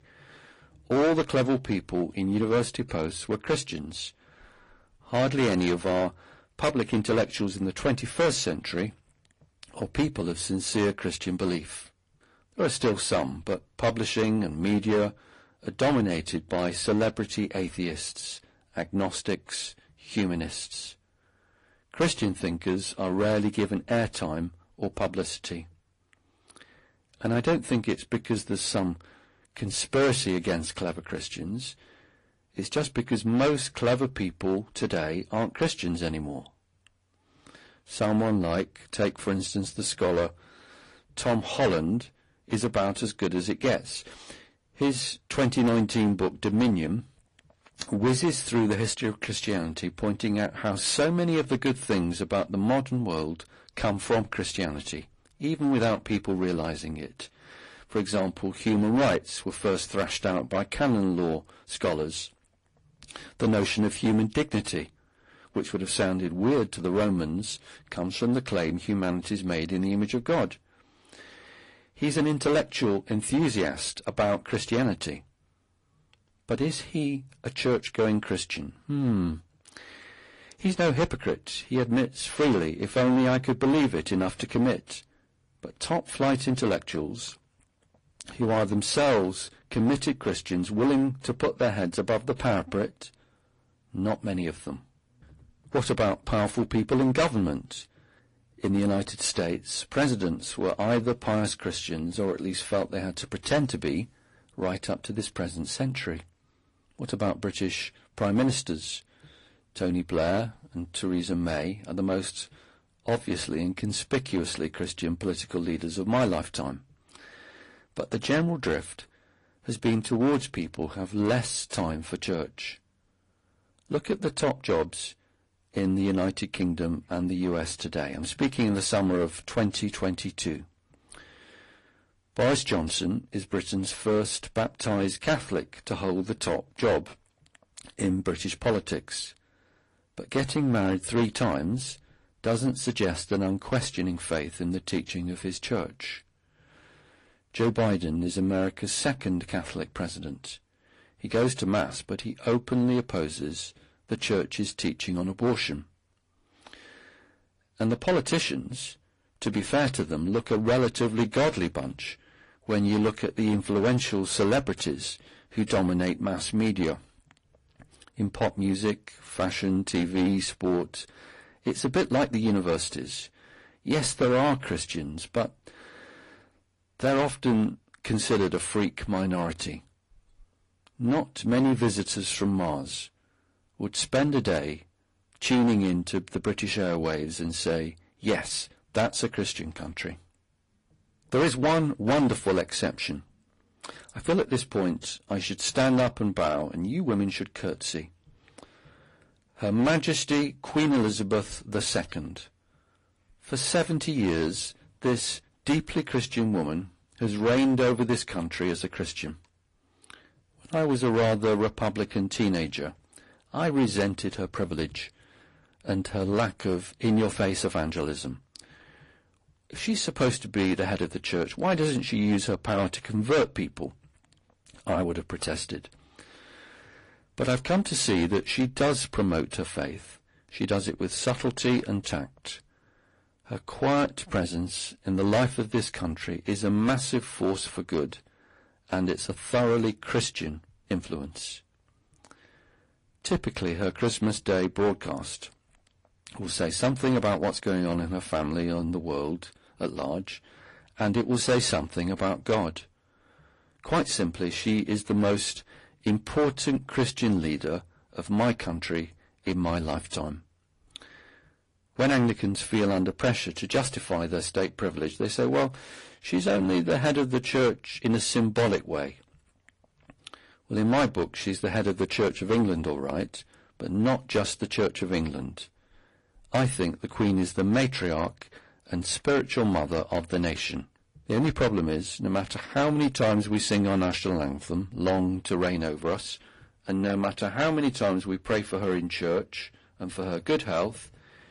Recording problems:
distortion; heavy; 6% of the sound clipped
garbled, watery; slightly; nothing above 10.5 kHz

